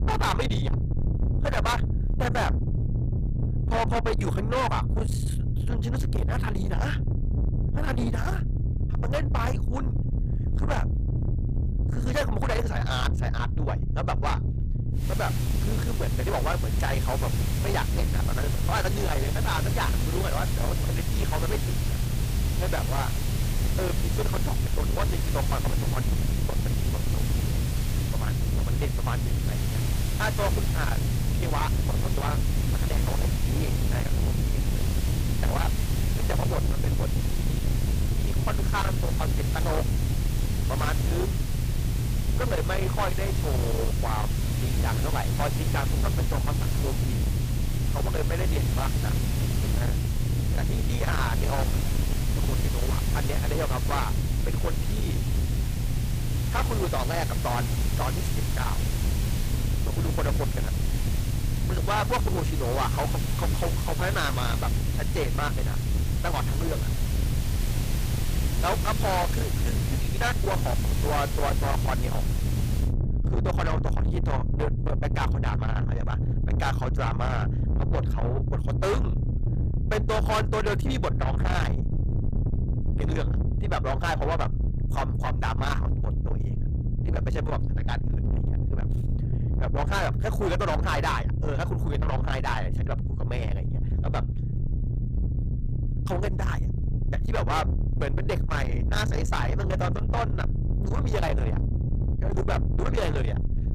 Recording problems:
distortion; heavy; 7 dB below the speech
hiss; loud; from 15 s to 1:13; 8 dB below the speech
low rumble; loud; throughout; 7 dB below the speech

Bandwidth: 15 kHz